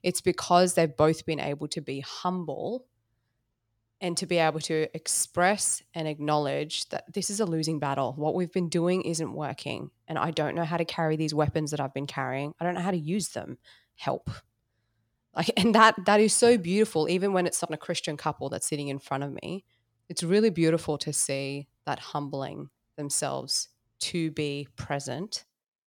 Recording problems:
none

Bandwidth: 18 kHz